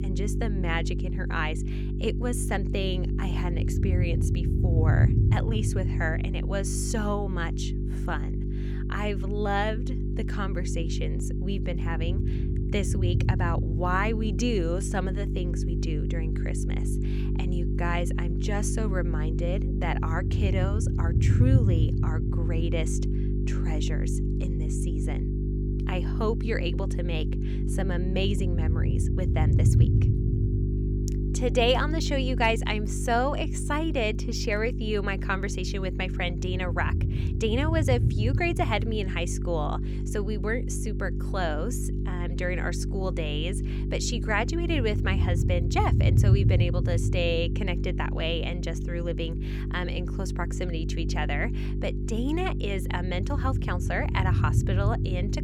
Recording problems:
electrical hum; loud; throughout; 50 Hz, 8 dB below the speech
low rumble; noticeable; throughout; 10 dB below the speech

